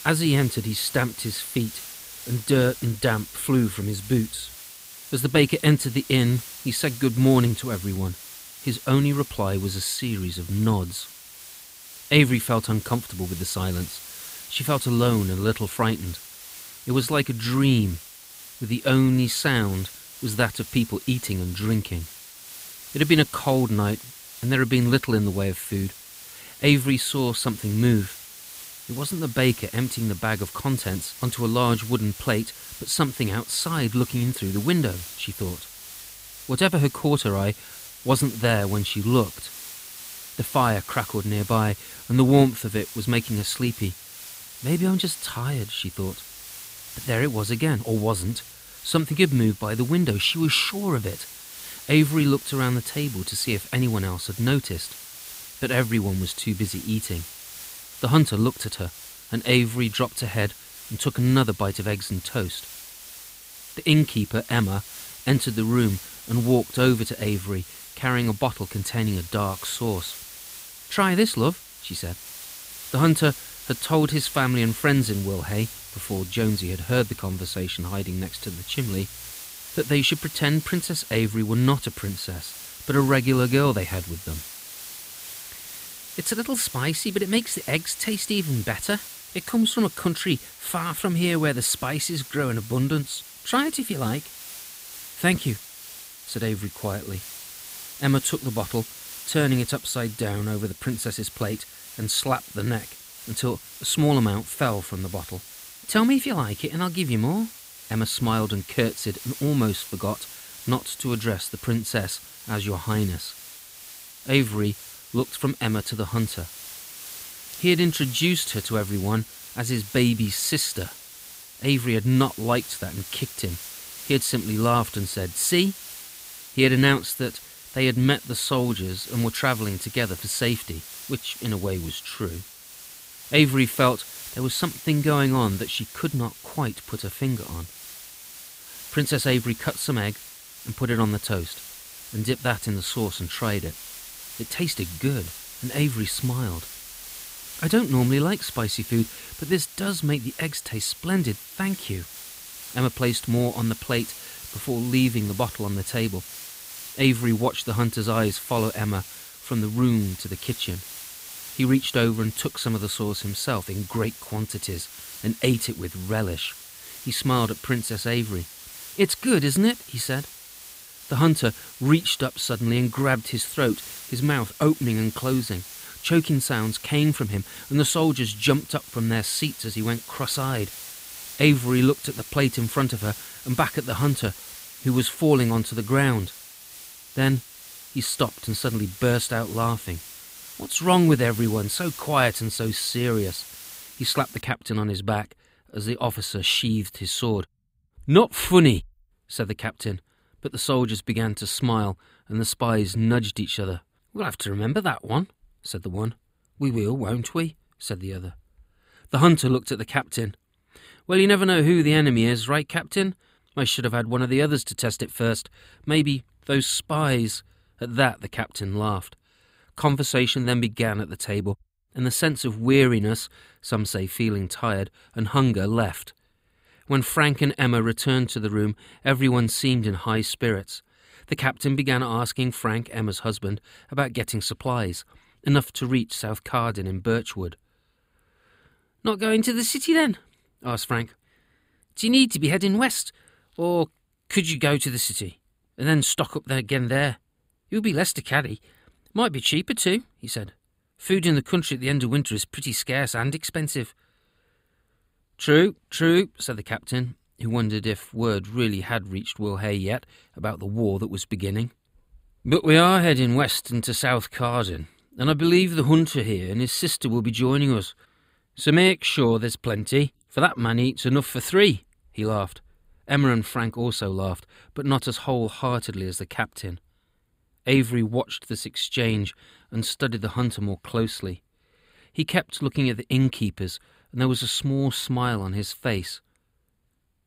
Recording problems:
hiss; noticeable; until 3:14; 15 dB below the speech

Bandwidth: 15.5 kHz